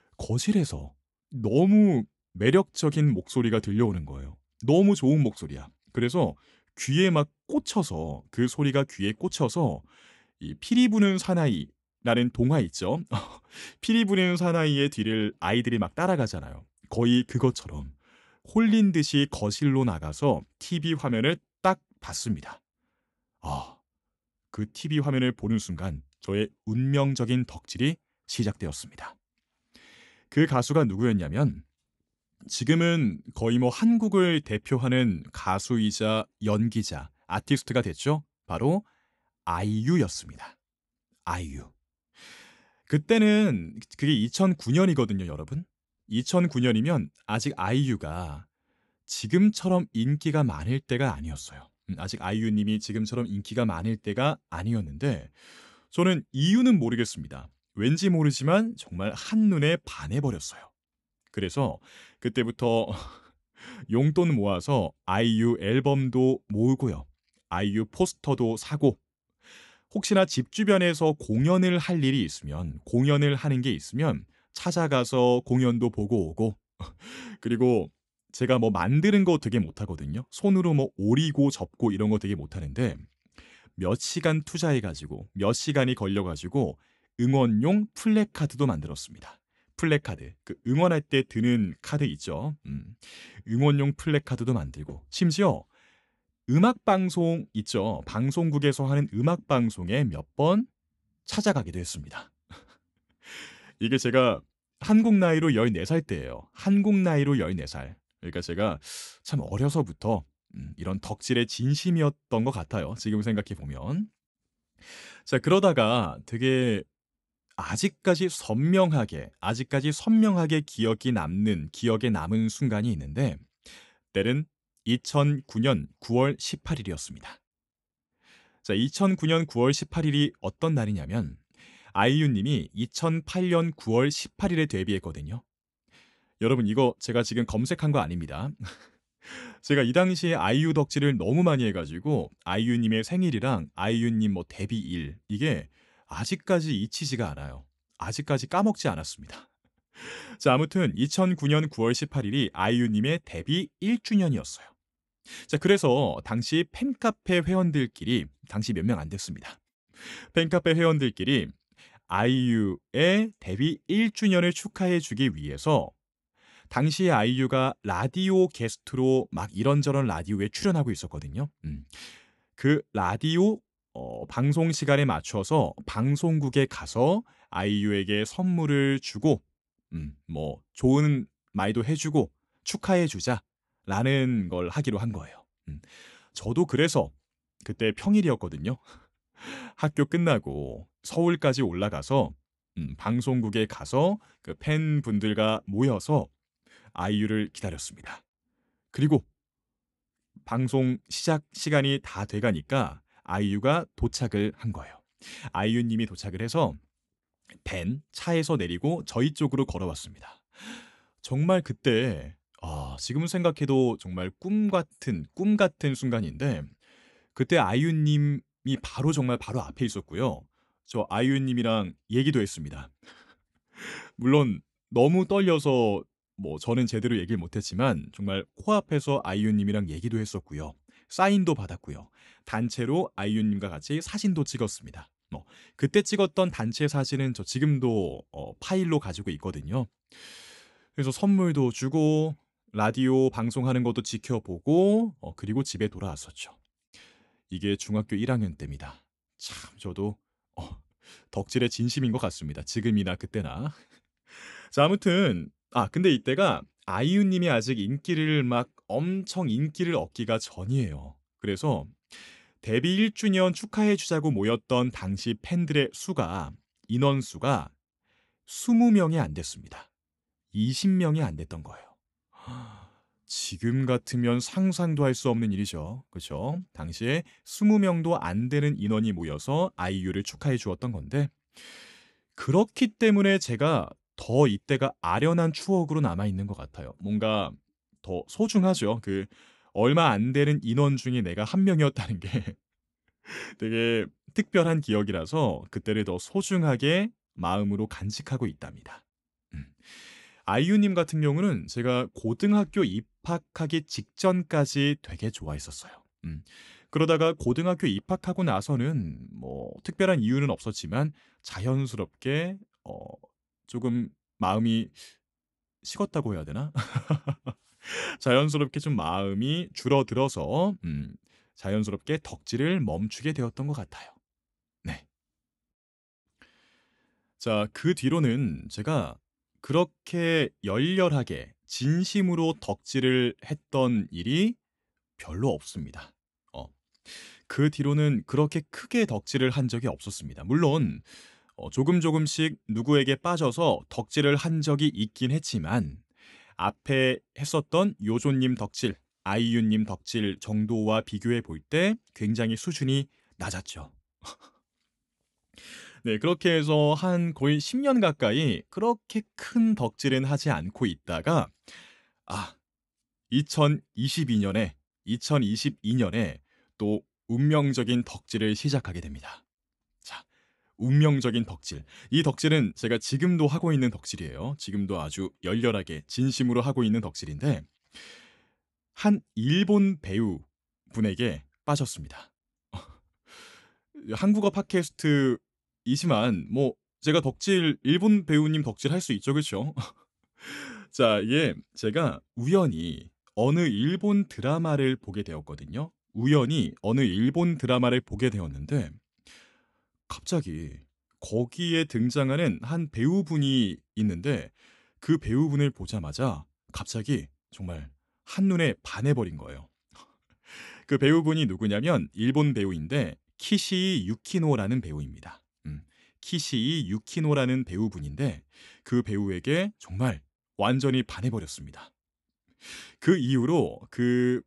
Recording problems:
none

